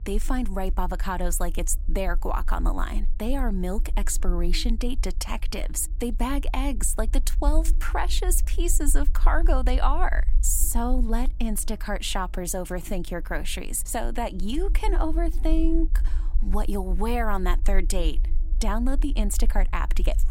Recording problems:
electrical hum; faint; throughout; 50 Hz, 30 dB below the speech
low rumble; faint; throughout; 25 dB below the speech

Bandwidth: 16 kHz